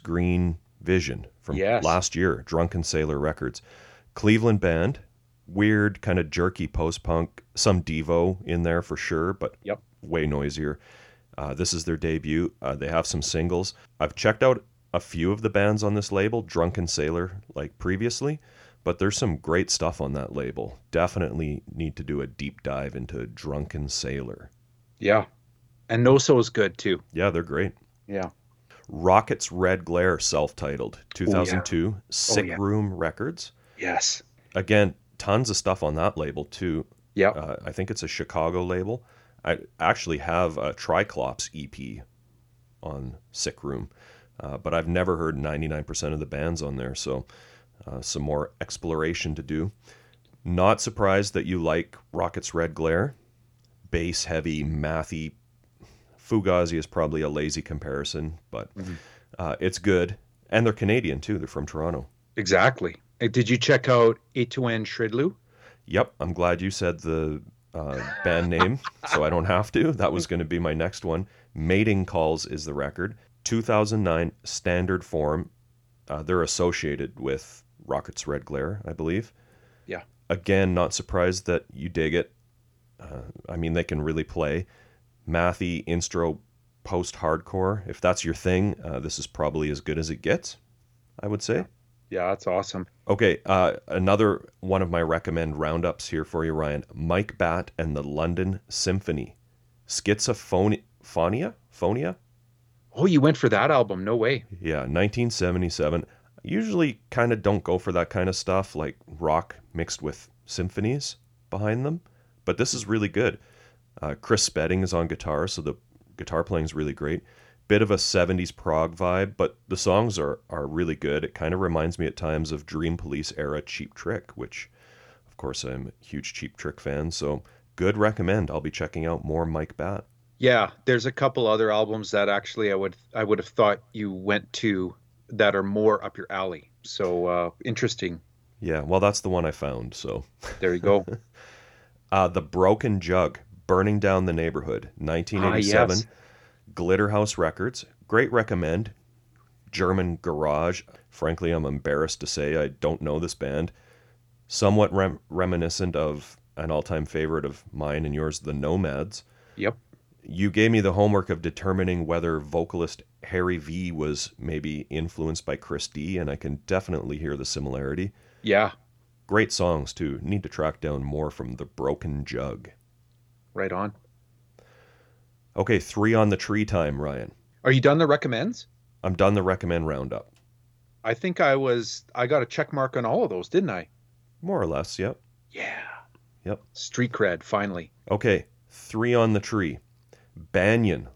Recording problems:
none

